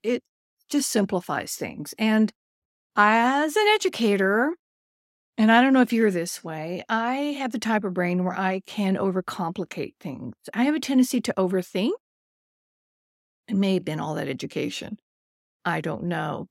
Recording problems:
none

